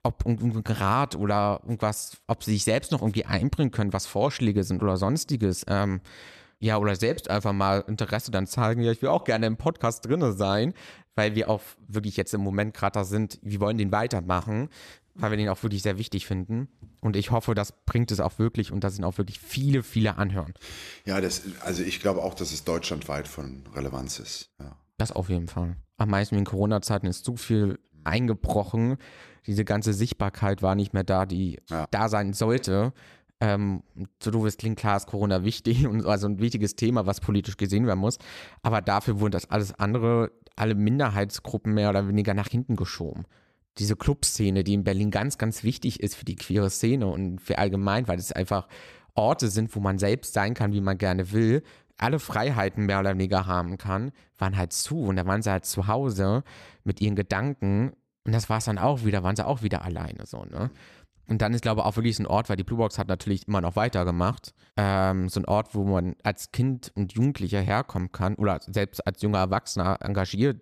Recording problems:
none

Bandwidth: 14 kHz